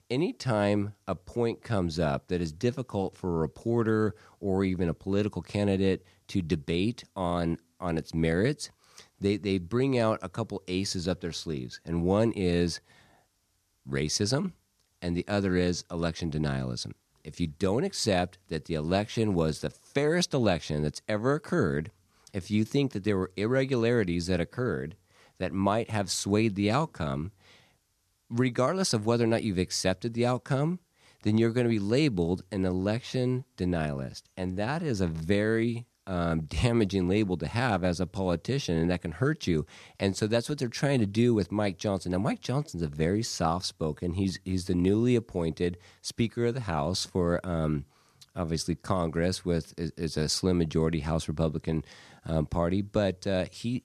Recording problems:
none

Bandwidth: 14 kHz